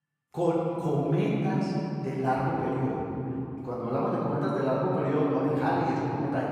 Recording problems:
room echo; strong; dies away in 3 s
off-mic speech; far

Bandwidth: 15.5 kHz